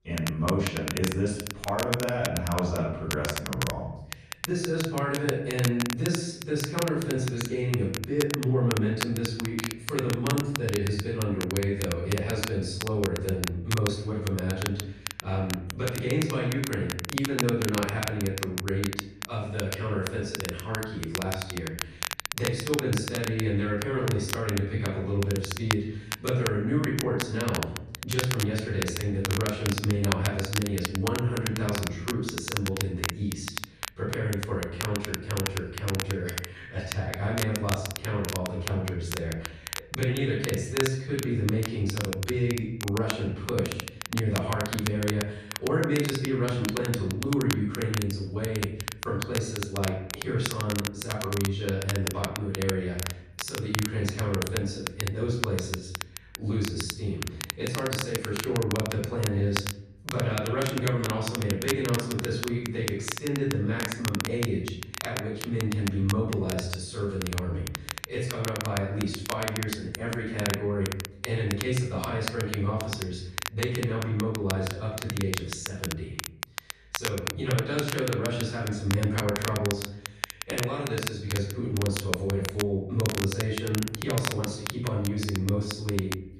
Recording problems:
off-mic speech; far
room echo; noticeable; dies away in 0.8 s
crackle, like an old record; loud; 6 dB below the speech

